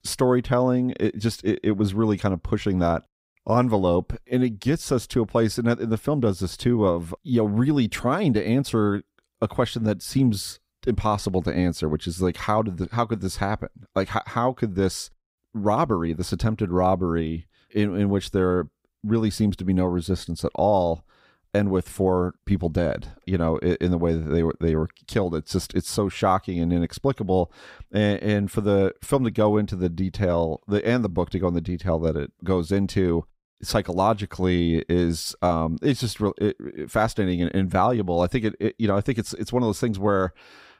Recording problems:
none

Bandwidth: 15.5 kHz